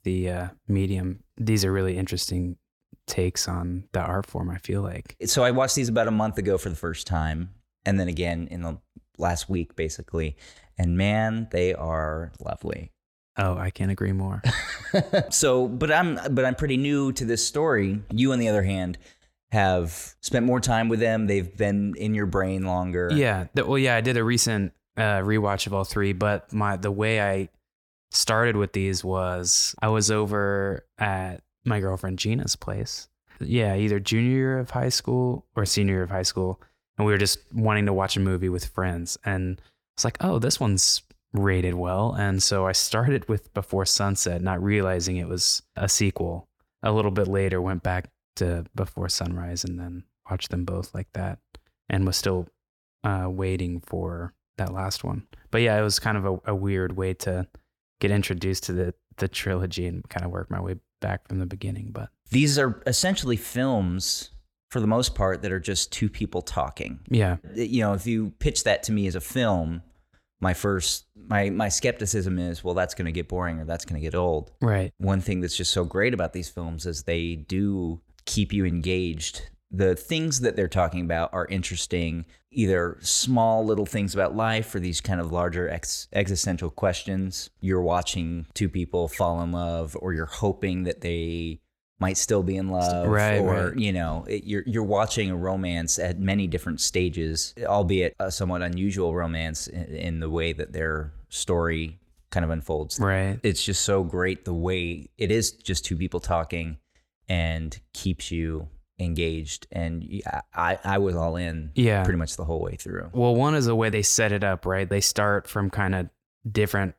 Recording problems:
none

